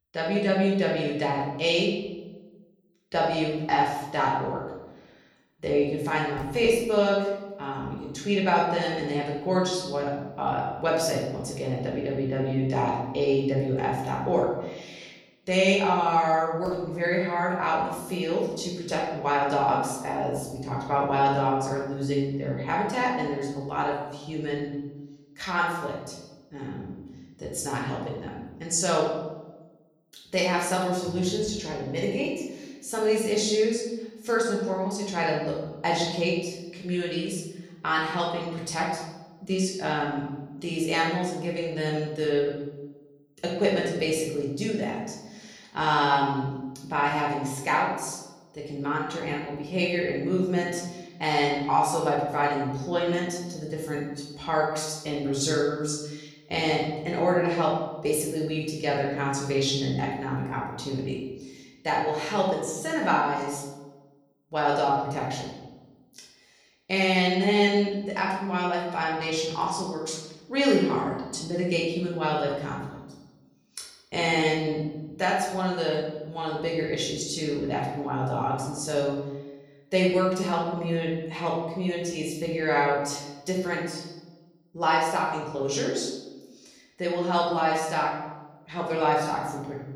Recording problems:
off-mic speech; far
room echo; noticeable; dies away in 0.9 s

